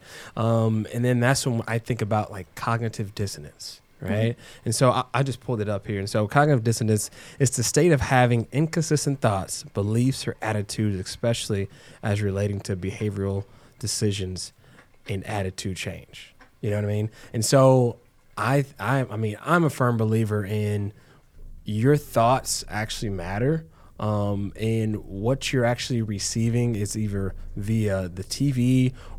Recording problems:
animal sounds; faint; throughout; 30 dB below the speech

